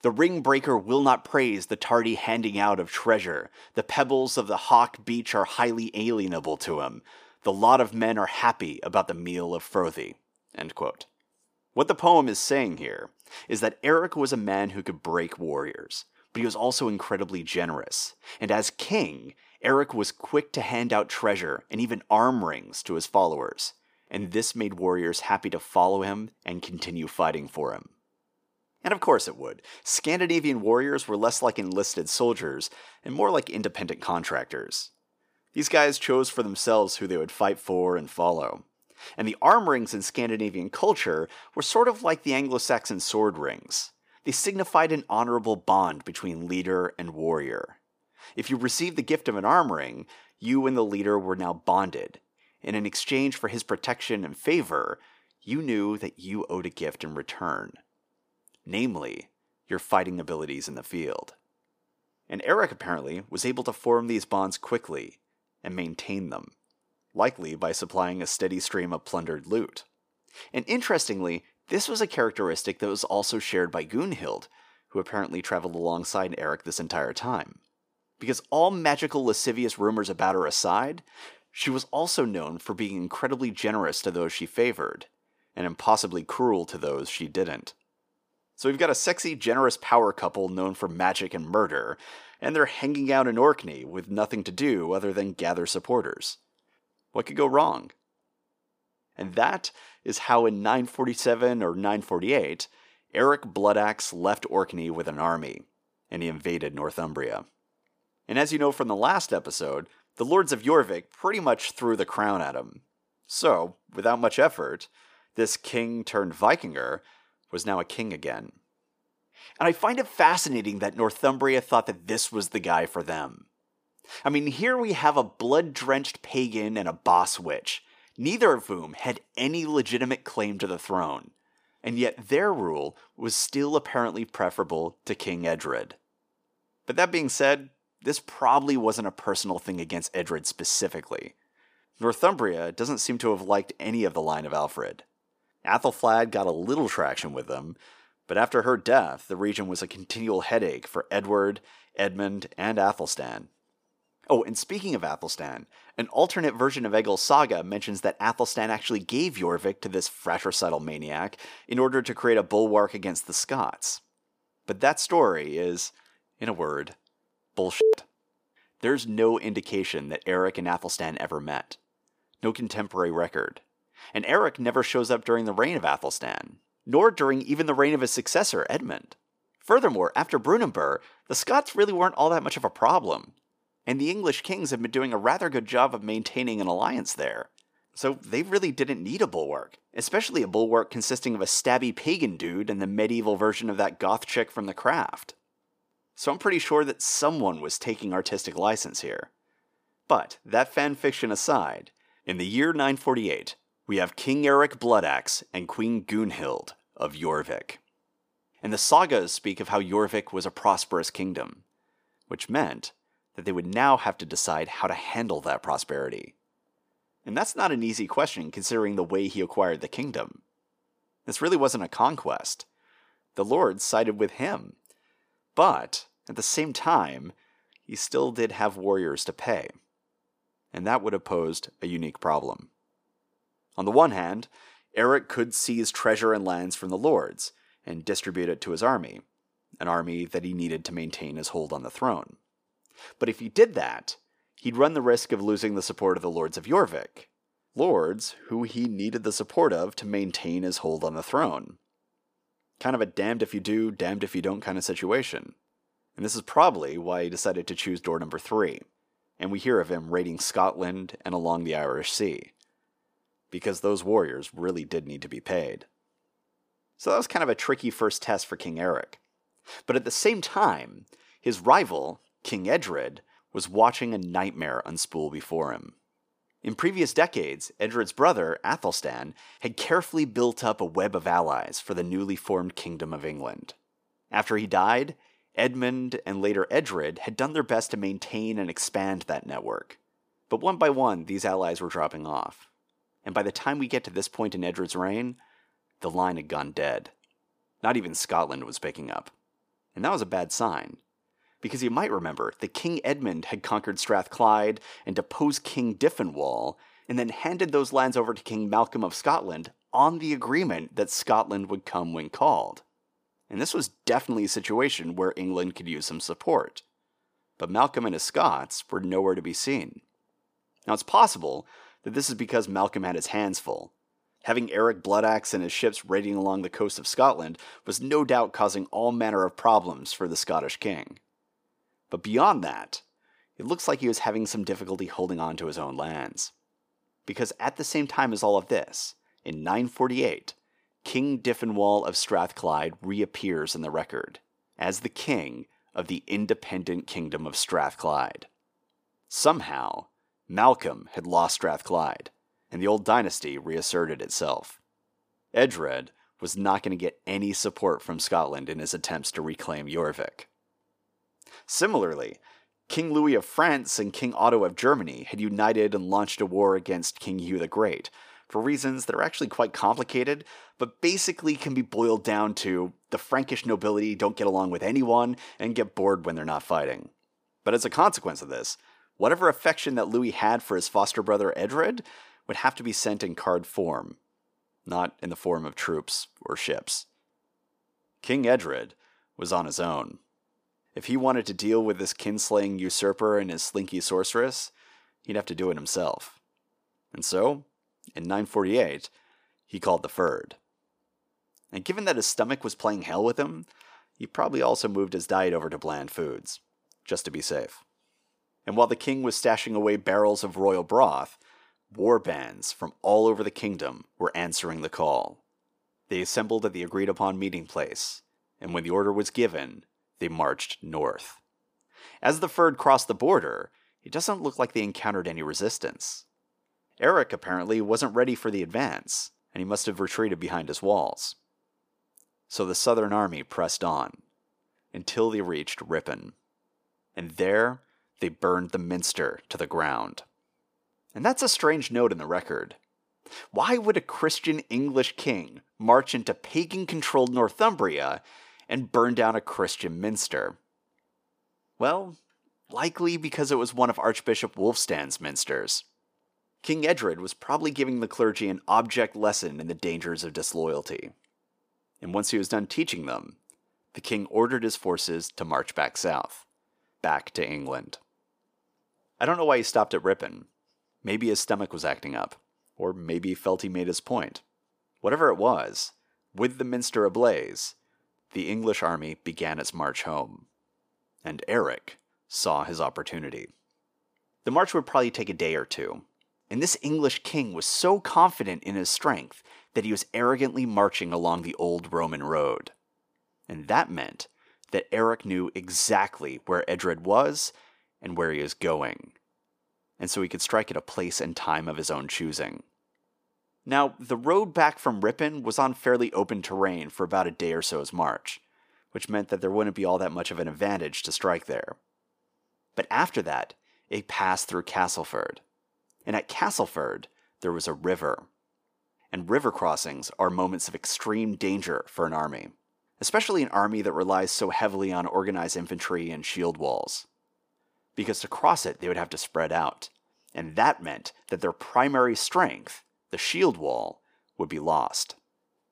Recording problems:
thin; somewhat; fading below 400 Hz

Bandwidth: 15 kHz